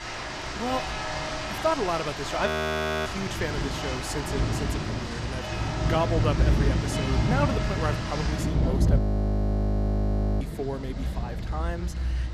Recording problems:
rain or running water; very loud; throughout; 3 dB above the speech
audio freezing; at 2.5 s for 0.5 s and at 9 s for 1.5 s

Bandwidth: 14.5 kHz